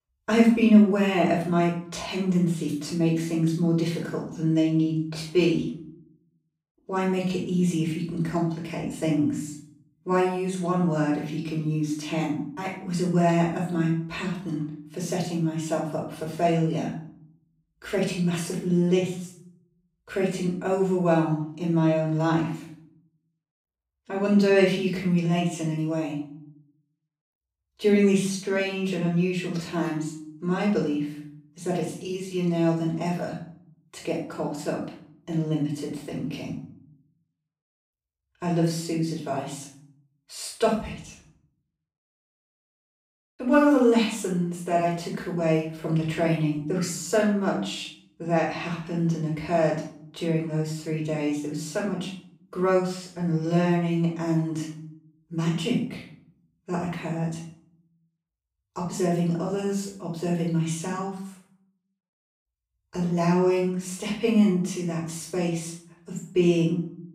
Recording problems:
off-mic speech; far
room echo; noticeable; dies away in 0.5 s

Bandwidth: 15.5 kHz